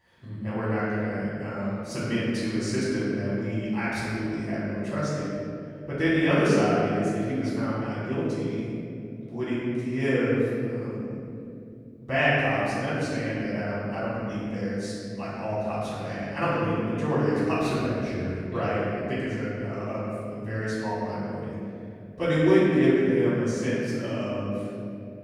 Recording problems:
room echo; strong; dies away in 2.8 s
off-mic speech; far

